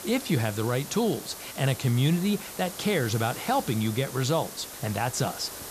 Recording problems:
hiss; noticeable; throughout; 10 dB below the speech

